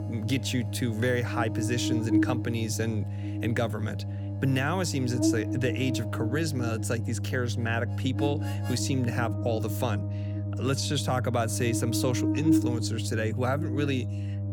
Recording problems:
electrical hum; loud; throughout; 50 Hz, 5 dB below the speech
background music; faint; throughout; 20 dB below the speech

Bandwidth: 18 kHz